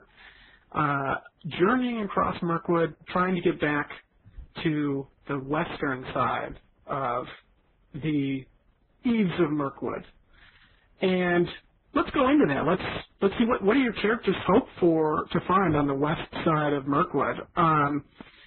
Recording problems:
garbled, watery; badly; nothing above 4 kHz
distortion; slight; 7 dB below the speech

